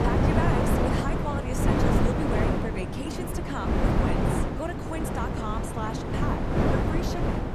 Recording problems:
wind noise on the microphone; heavy; 5 dB above the speech

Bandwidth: 14 kHz